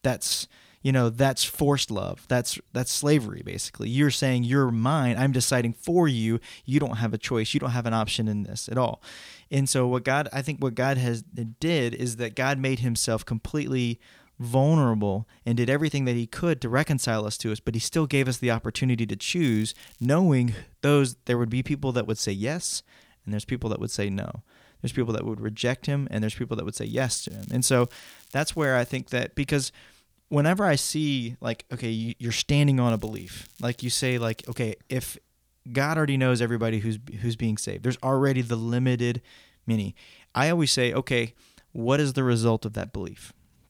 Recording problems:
crackling; faint; at 19 s, from 27 to 29 s and from 33 to 35 s; 25 dB below the speech

